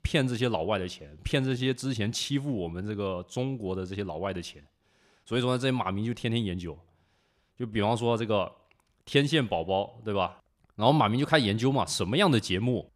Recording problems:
uneven, jittery; slightly; from 1 to 11 s

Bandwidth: 14.5 kHz